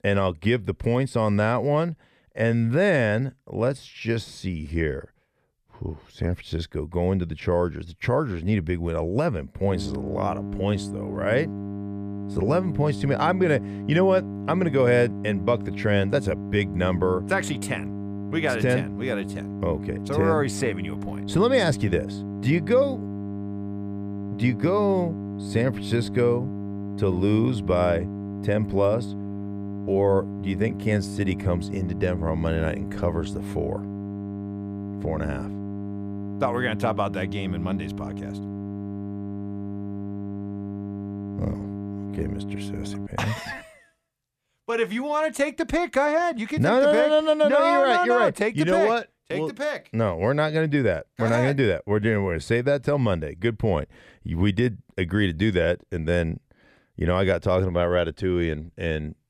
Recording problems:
electrical hum; noticeable; from 9.5 to 43 s; 50 Hz, 15 dB below the speech

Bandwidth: 14.5 kHz